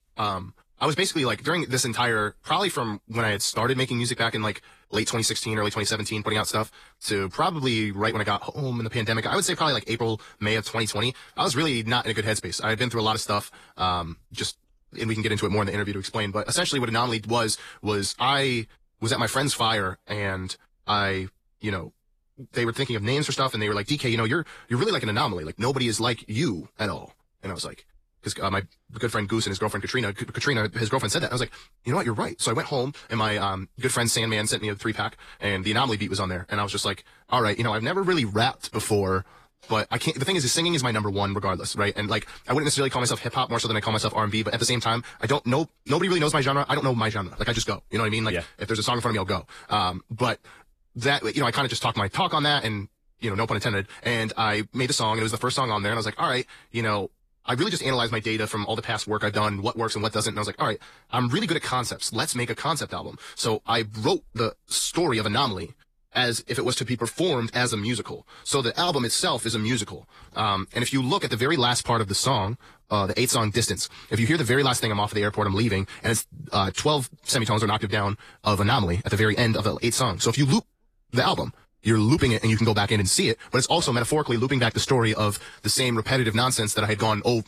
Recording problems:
wrong speed, natural pitch; too fast; 1.6 times normal speed
garbled, watery; slightly; nothing above 14.5 kHz

